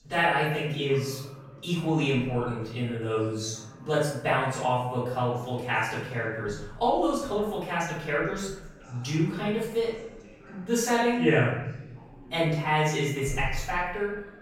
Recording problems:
off-mic speech; far
room echo; noticeable; dies away in 0.8 s
background chatter; faint; throughout; 2 voices, 25 dB below the speech

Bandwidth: 16 kHz